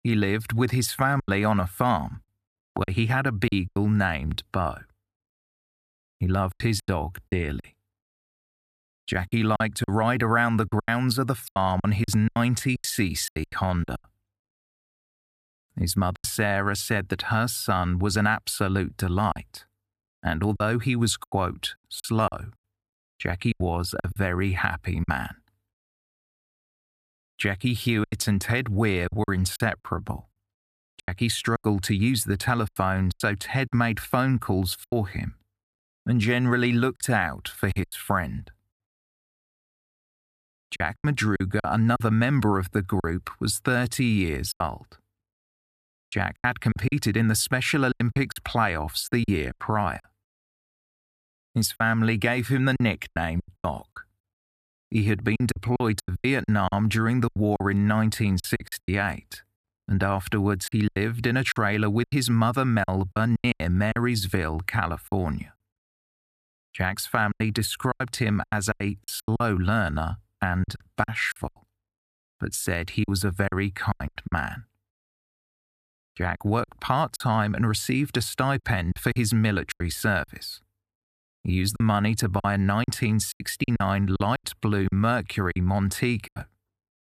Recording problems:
choppy; very; 11% of the speech affected

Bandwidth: 14.5 kHz